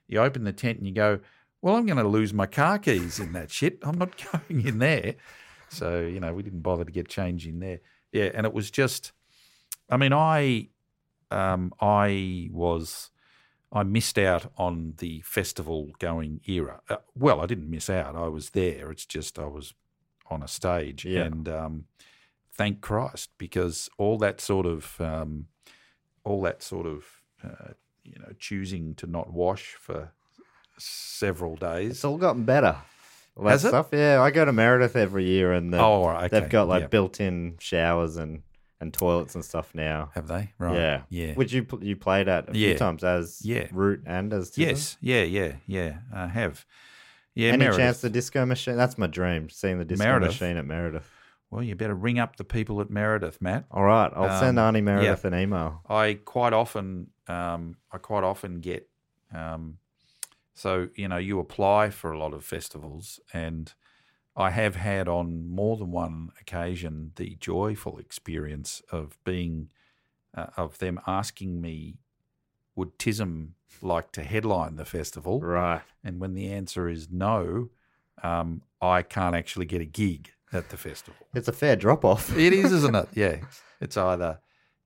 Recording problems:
none

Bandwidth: 16 kHz